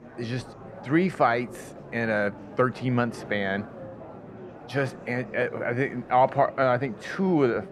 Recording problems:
muffled; very; fading above 2.5 kHz
murmuring crowd; noticeable; throughout; 15 dB below the speech

